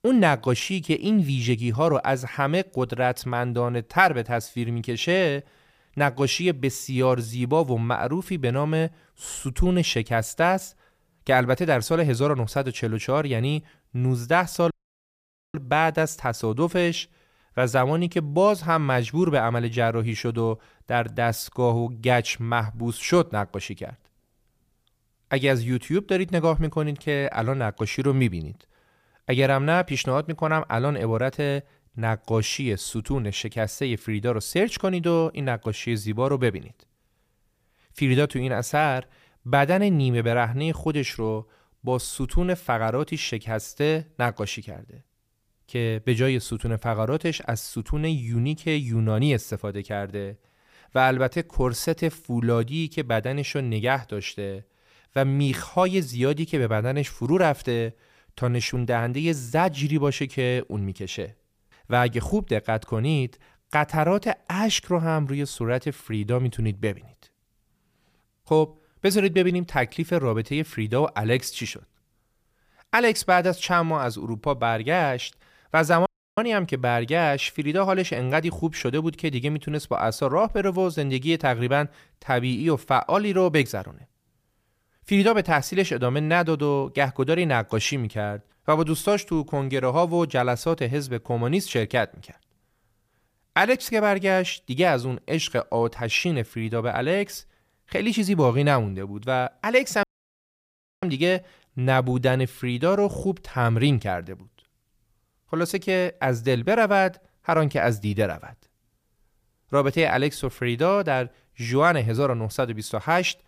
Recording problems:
audio cutting out; at 15 s for 1 s, at 1:16 and at 1:40 for 1 s

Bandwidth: 15 kHz